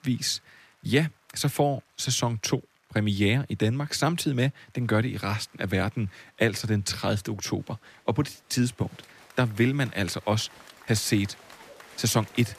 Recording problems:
crowd noise; faint; throughout; 25 dB below the speech

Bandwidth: 14.5 kHz